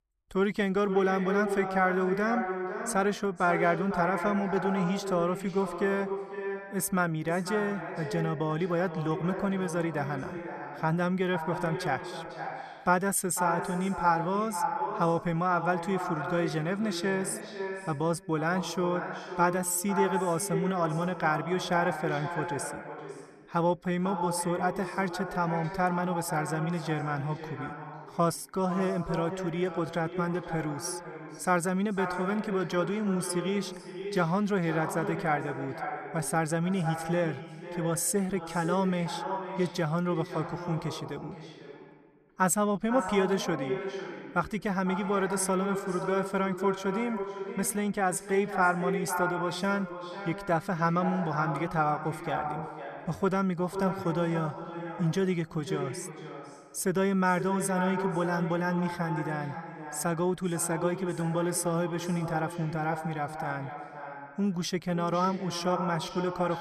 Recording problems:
echo of what is said; strong; throughout; 500 ms later, 7 dB below the speech

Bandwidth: 13.5 kHz